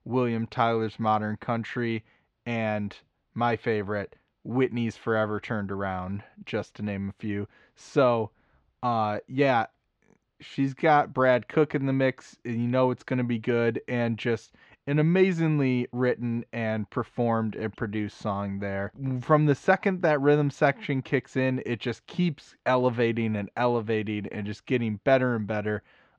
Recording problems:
muffled; slightly; fading above 4 kHz

